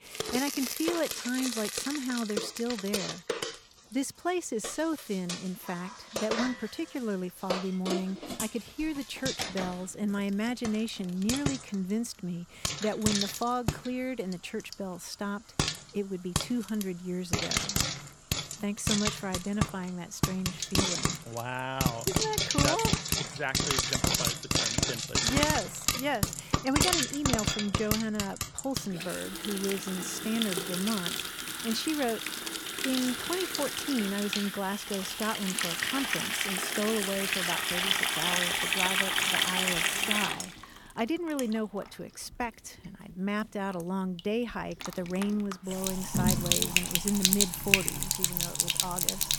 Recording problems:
household noises; very loud; throughout; 4 dB above the speech

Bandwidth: 18.5 kHz